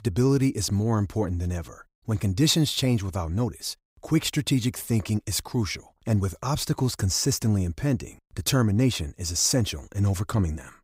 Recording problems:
none

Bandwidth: 15.5 kHz